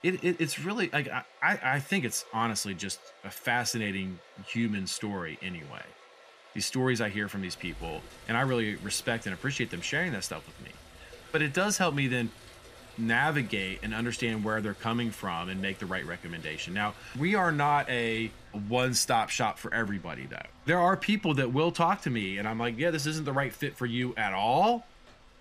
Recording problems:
rain or running water; faint; throughout; 20 dB below the speech

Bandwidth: 15 kHz